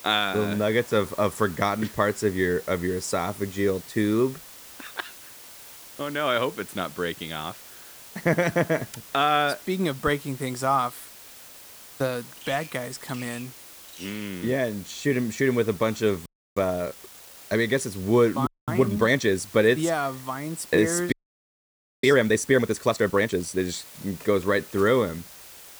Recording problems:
hiss; noticeable; throughout; 20 dB below the speech
animal sounds; faint; throughout; 25 dB below the speech
audio freezing; at 16 s, at 18 s and at 21 s for 1 s

